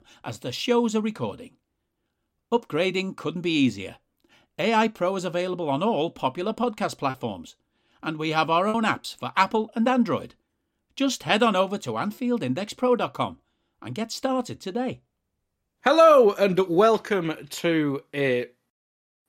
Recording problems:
choppy; occasionally; 1% of the speech affected

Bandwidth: 16 kHz